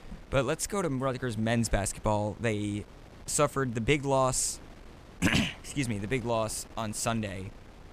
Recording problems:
wind noise on the microphone; occasional gusts; 25 dB below the speech

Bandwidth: 14.5 kHz